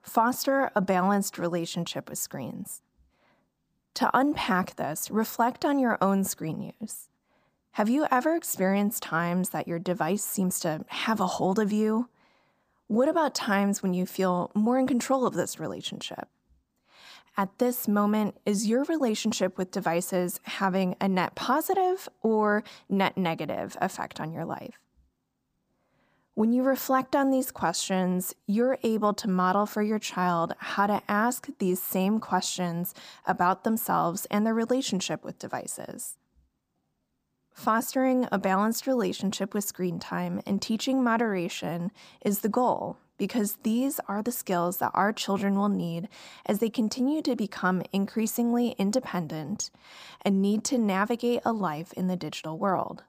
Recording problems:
none

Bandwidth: 15 kHz